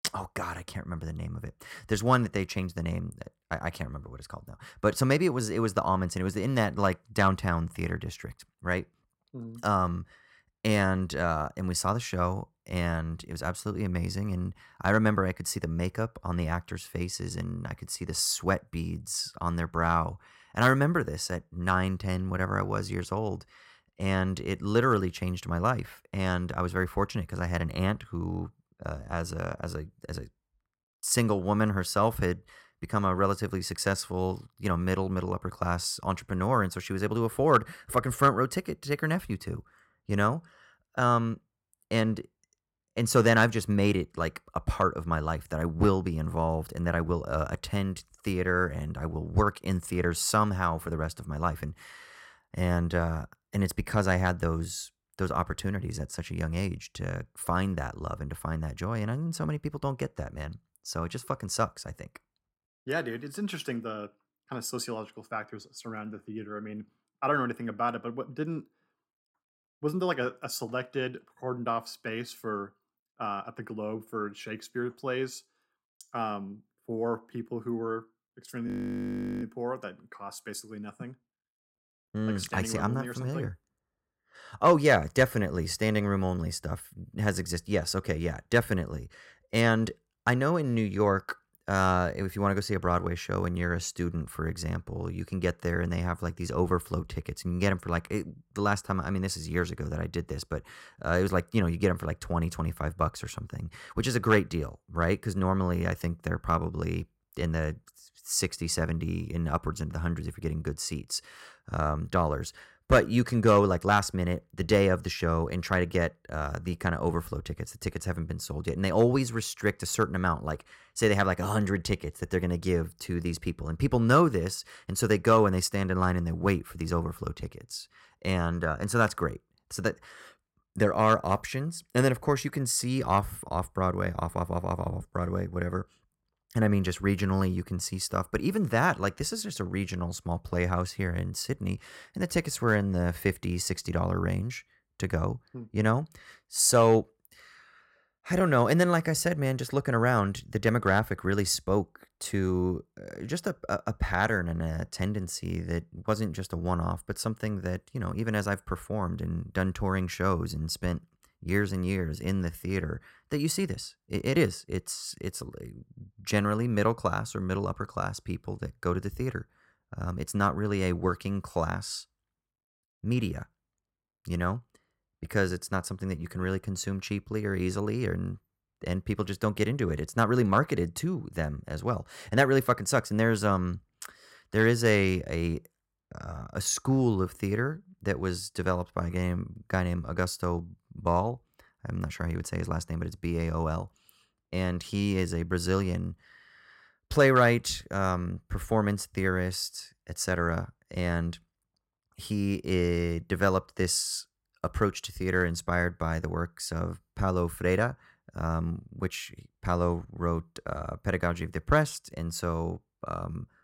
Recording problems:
audio freezing; at 1:19 for 0.5 s

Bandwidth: 16 kHz